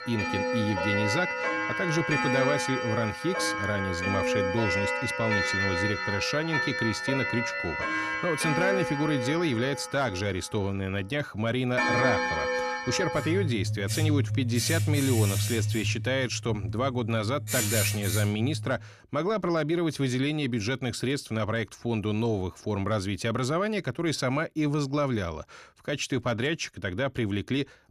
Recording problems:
household noises; very loud; until 19 s; as loud as the speech

